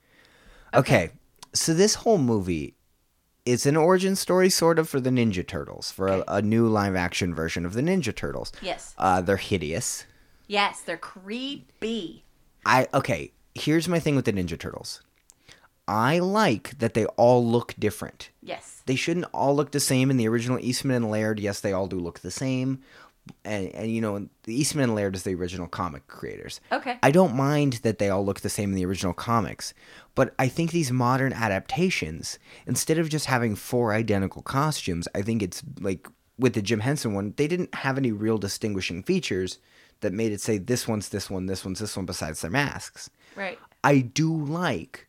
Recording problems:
none

